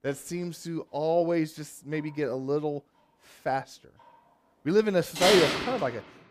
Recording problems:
household noises; very loud; throughout; 1 dB above the speech

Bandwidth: 15 kHz